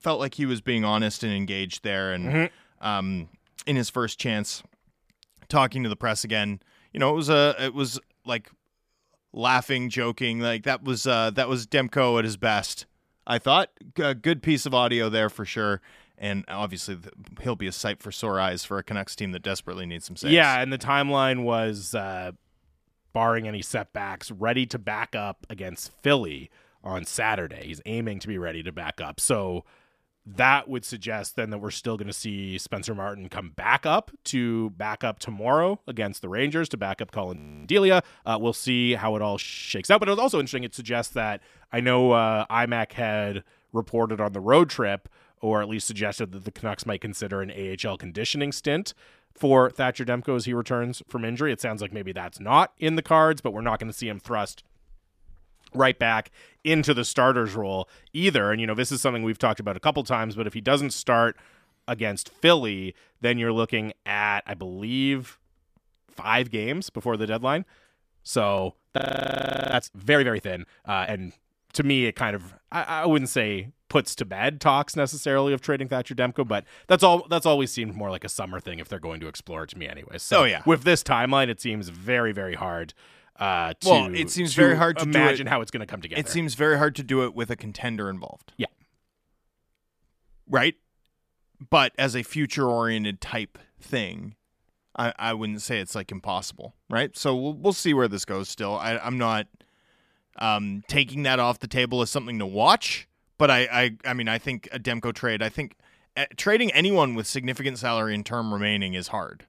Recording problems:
audio freezing; at 37 s, at 39 s and at 1:09 for 1 s

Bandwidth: 14.5 kHz